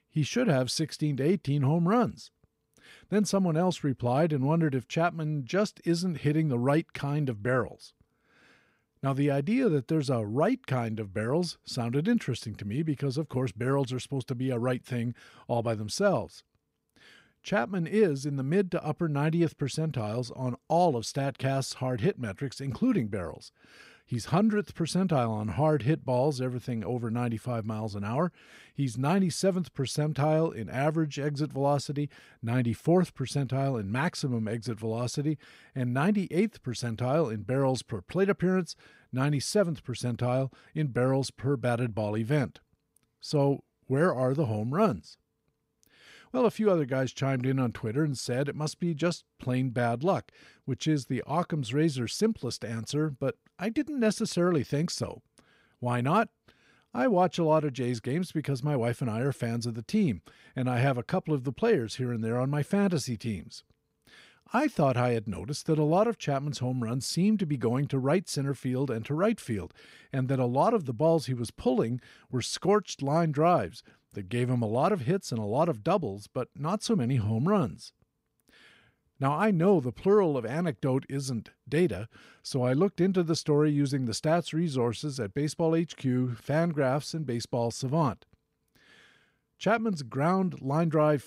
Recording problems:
none

